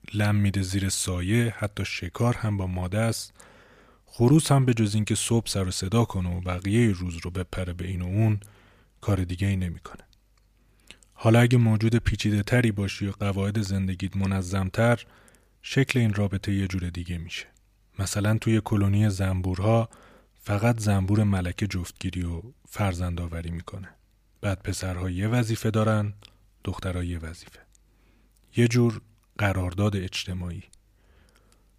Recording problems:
none

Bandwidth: 15 kHz